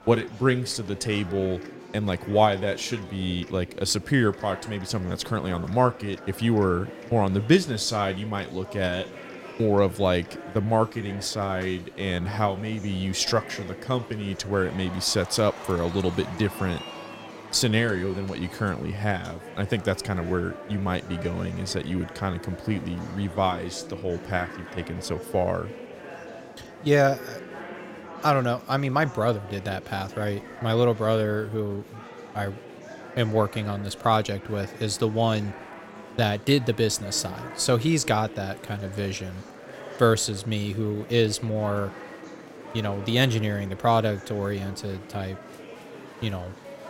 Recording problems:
murmuring crowd; noticeable; throughout; 15 dB below the speech

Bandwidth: 16 kHz